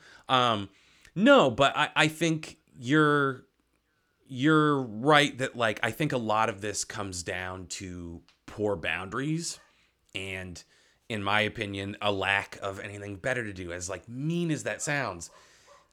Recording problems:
none

